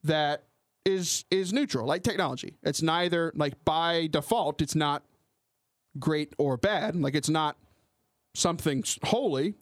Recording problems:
squashed, flat; somewhat

